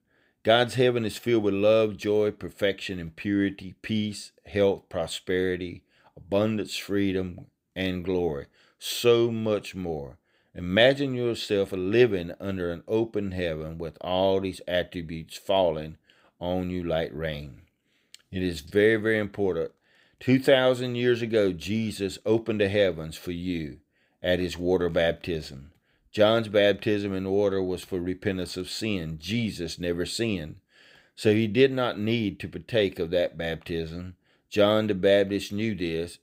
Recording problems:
none

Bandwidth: 15.5 kHz